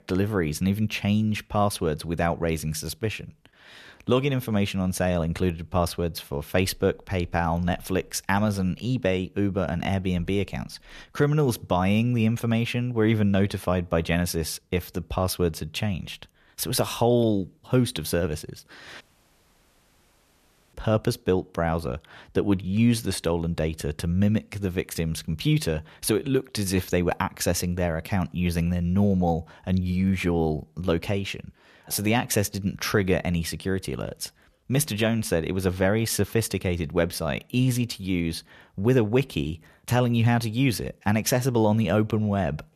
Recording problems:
audio cutting out; at 19 s for 1.5 s

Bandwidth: 14 kHz